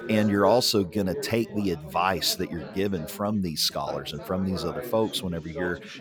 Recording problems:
background chatter; noticeable; throughout; 4 voices, 10 dB below the speech

